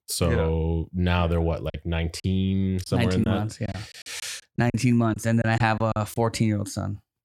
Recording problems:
choppy; very; from 1.5 to 6 s; 10% of the speech affected

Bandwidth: 17.5 kHz